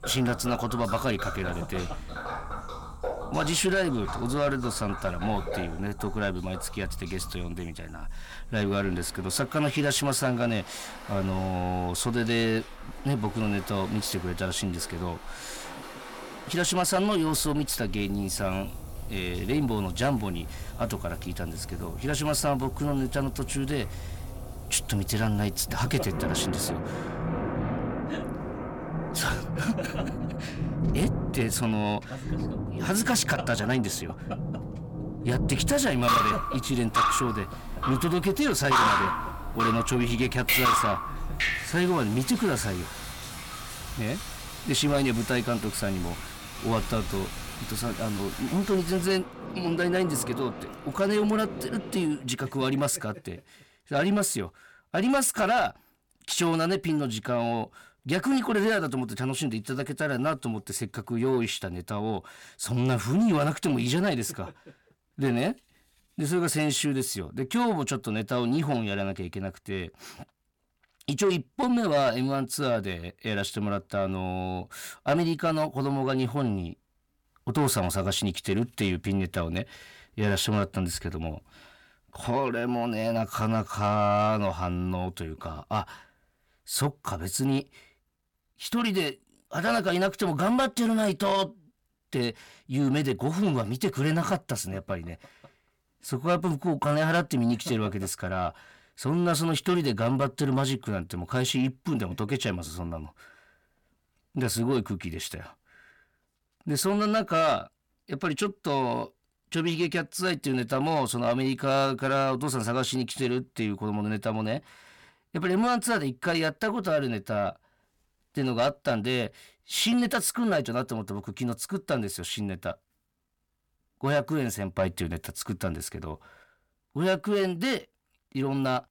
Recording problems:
distortion; slight; 10 dB below the speech
rain or running water; loud; until 52 s; 5 dB below the speech

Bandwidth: 18 kHz